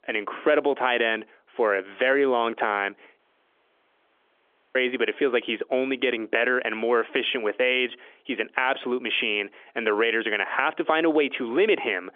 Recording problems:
phone-call audio; nothing above 3.5 kHz
audio cutting out; at 3 s for 1.5 s

